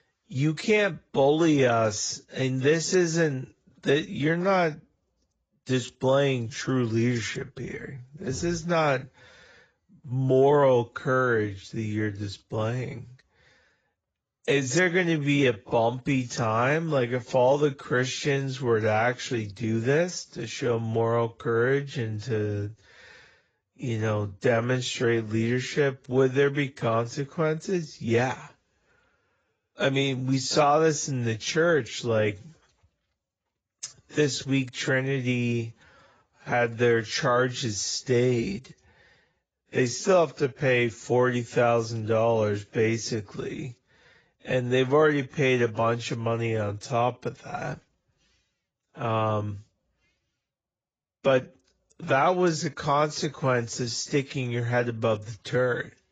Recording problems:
garbled, watery; badly; nothing above 7.5 kHz
wrong speed, natural pitch; too slow; 0.7 times normal speed

